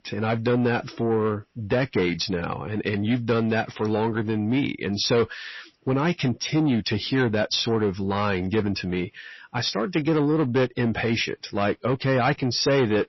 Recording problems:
distortion; slight; 10 dB below the speech
garbled, watery; slightly; nothing above 5.5 kHz

